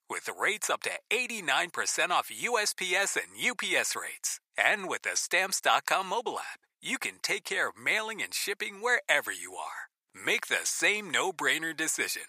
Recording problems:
thin; very; fading below 800 Hz

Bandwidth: 15 kHz